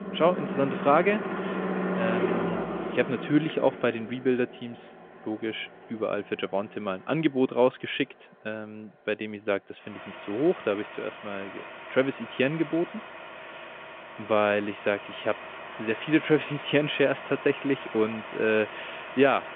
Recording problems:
phone-call audio; nothing above 3.5 kHz
traffic noise; loud; throughout; 8 dB below the speech

